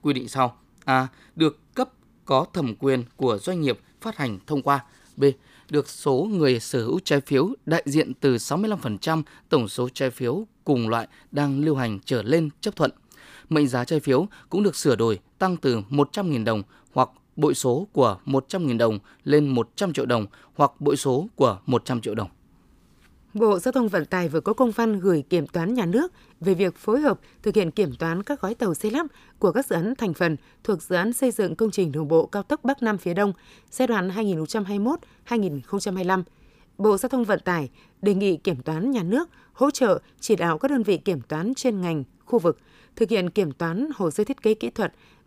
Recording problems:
none

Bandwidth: 15 kHz